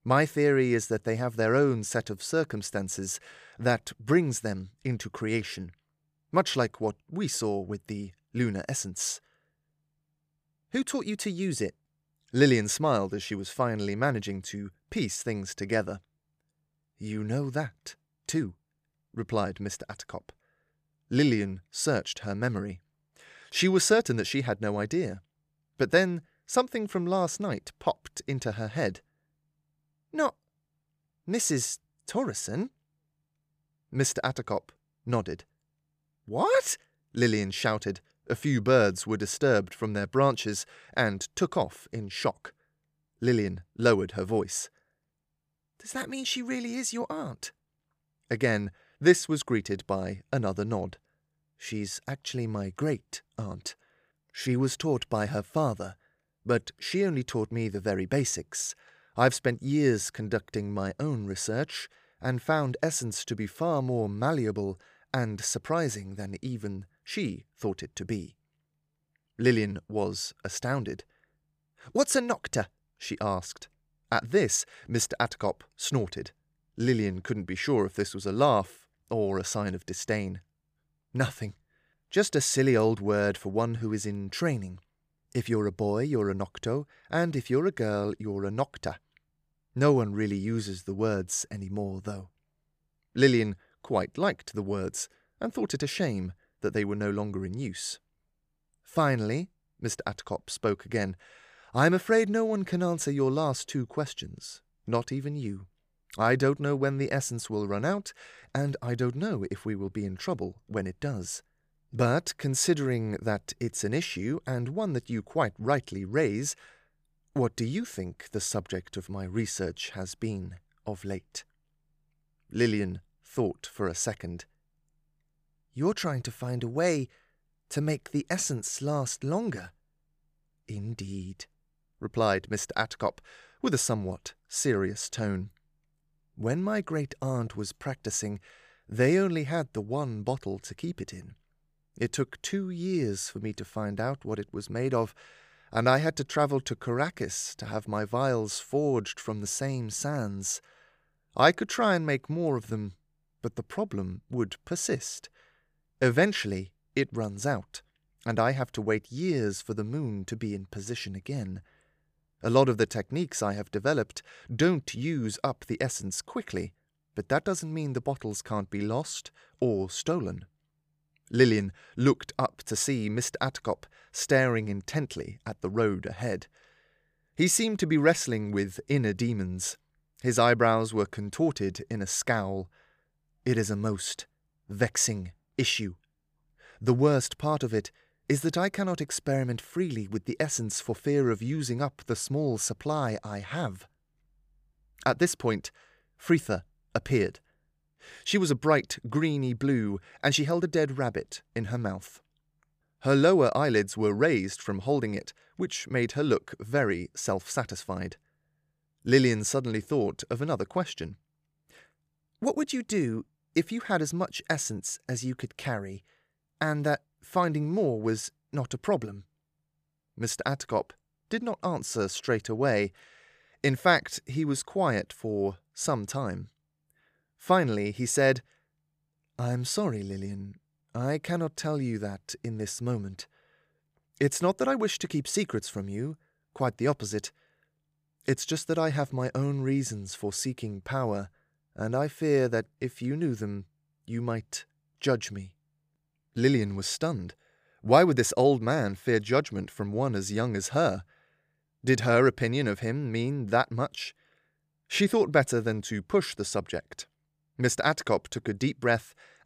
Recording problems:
none

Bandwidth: 15 kHz